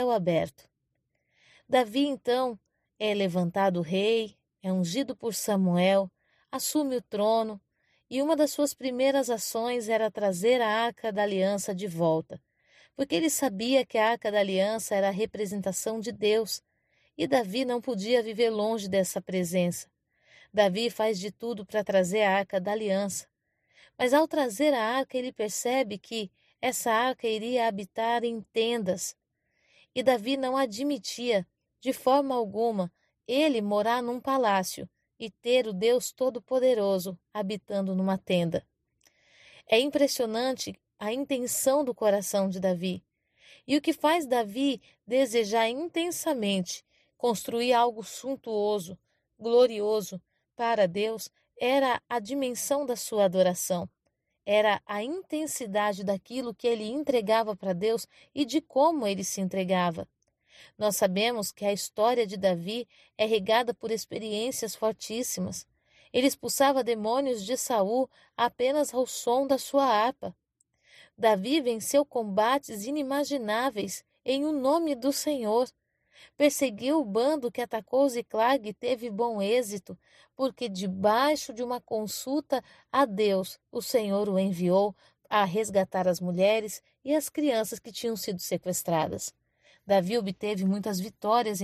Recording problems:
abrupt cut into speech; at the start and the end

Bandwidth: 14.5 kHz